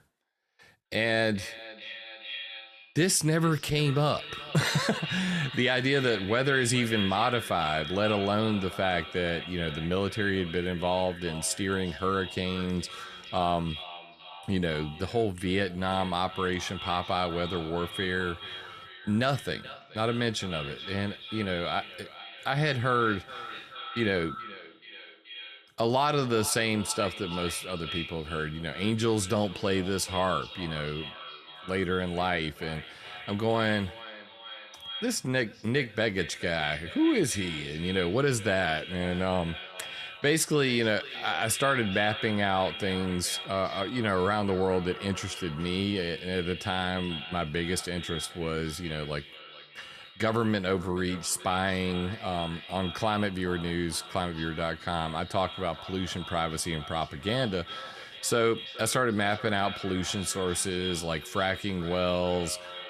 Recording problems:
echo of what is said; strong; throughout; 430 ms later, 10 dB below the speech

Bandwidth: 13.5 kHz